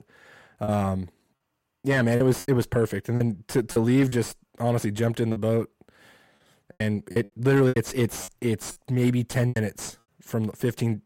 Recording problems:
distortion; slight; 10 dB below the speech
choppy; very; 9% of the speech affected

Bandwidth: 16 kHz